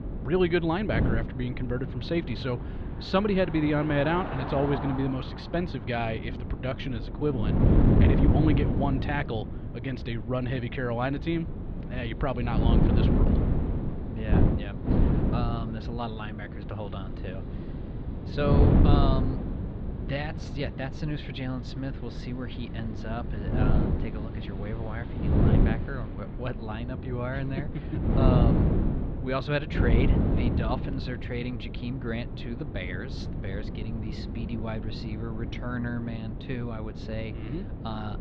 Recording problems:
muffled; slightly; fading above 4 kHz
wind noise on the microphone; heavy; 3 dB below the speech
traffic noise; noticeable; throughout; 10 dB below the speech

